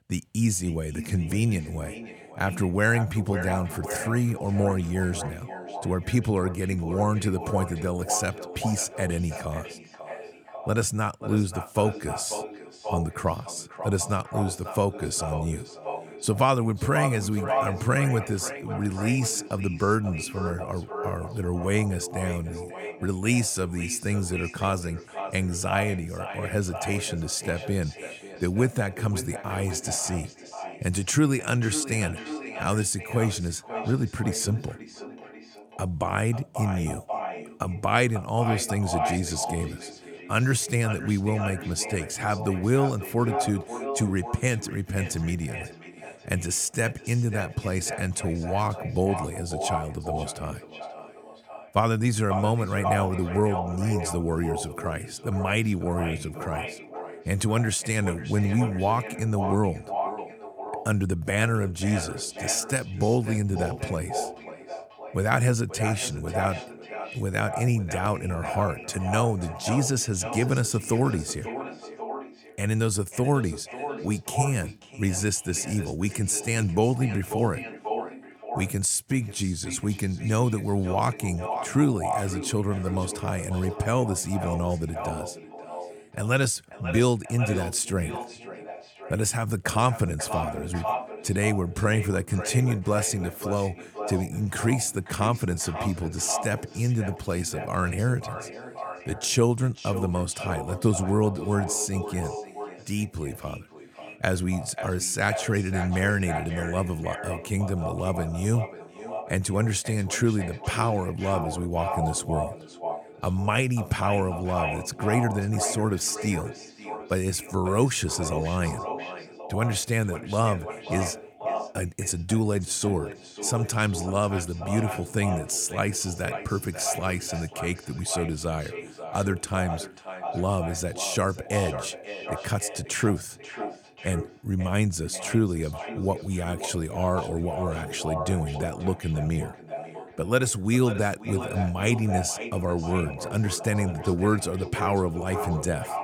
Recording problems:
echo of what is said; strong; throughout; 540 ms later, 9 dB below the speech

